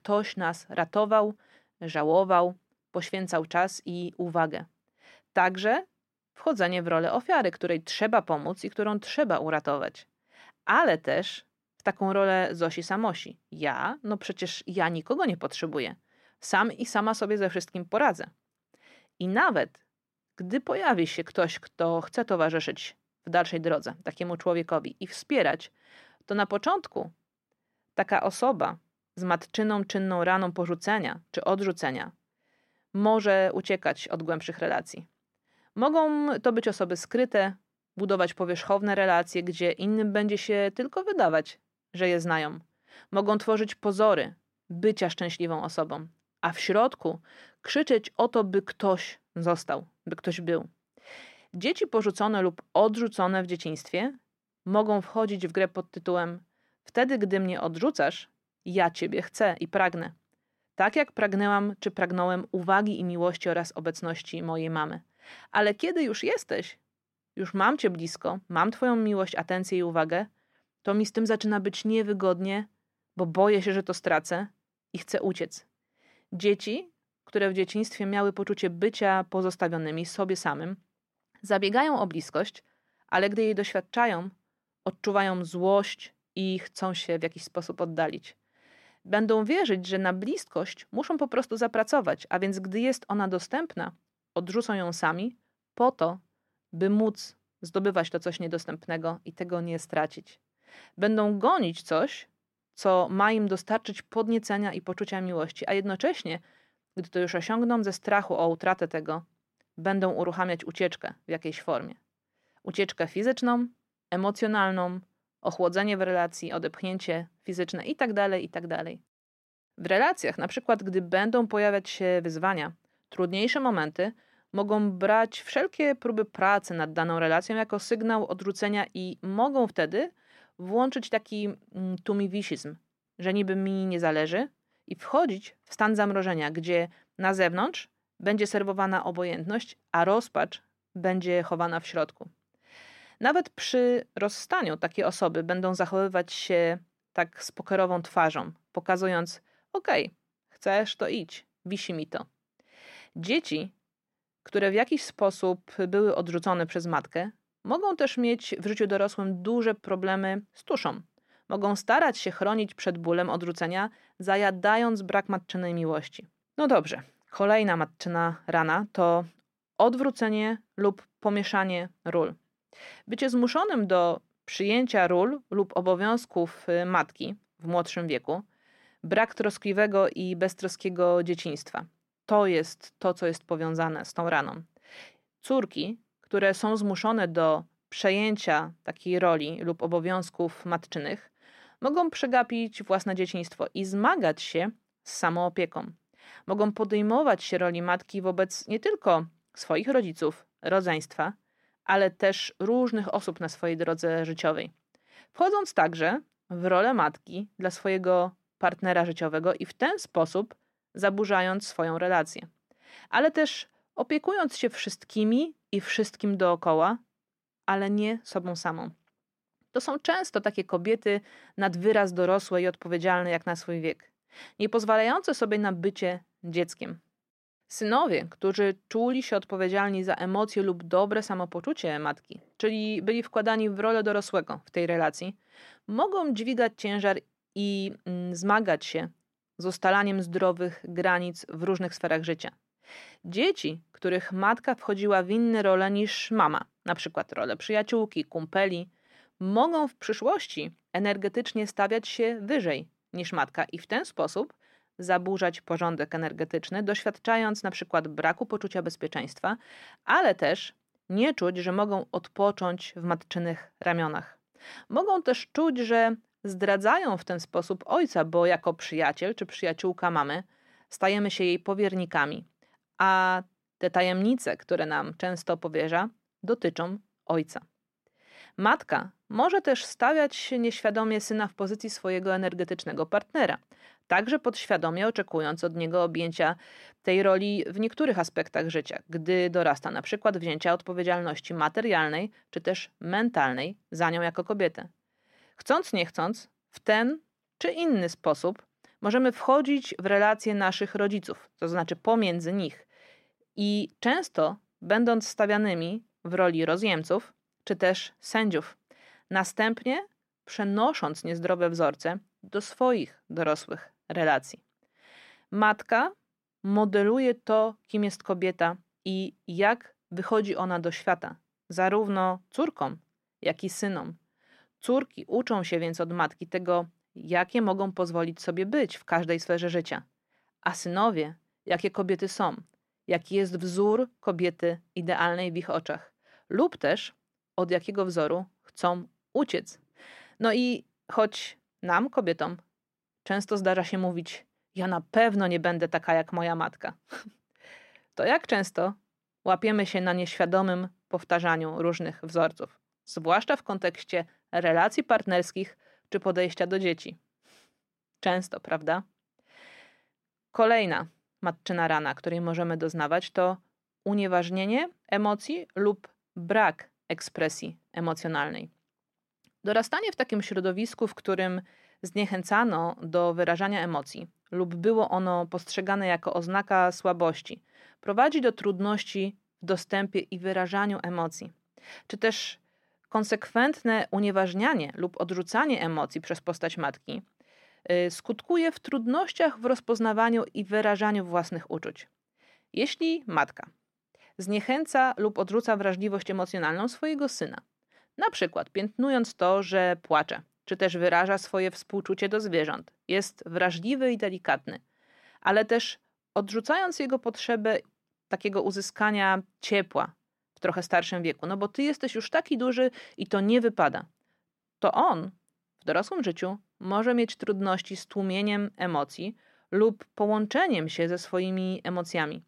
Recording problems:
muffled; slightly; fading above 3.5 kHz

